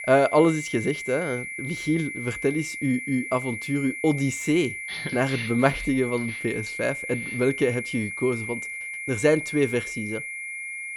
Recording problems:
high-pitched whine; loud; throughout; 2 kHz, 6 dB below the speech

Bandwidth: 18.5 kHz